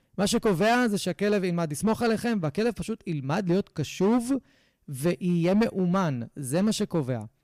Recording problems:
distortion; slight; 7% of the sound clipped

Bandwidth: 15 kHz